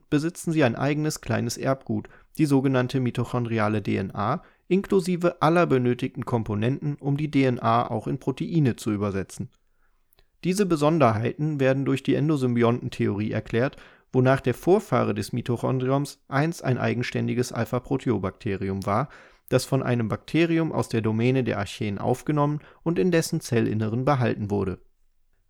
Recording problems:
none

